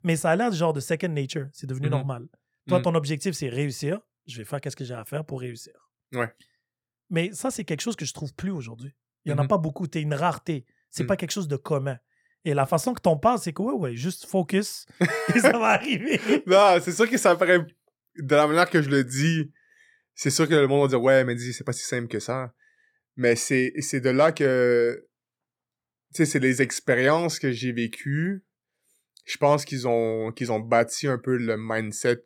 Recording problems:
none

